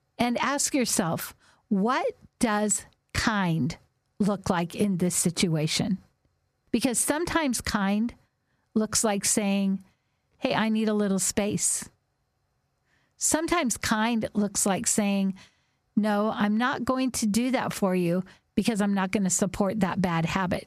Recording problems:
squashed, flat; somewhat

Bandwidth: 14.5 kHz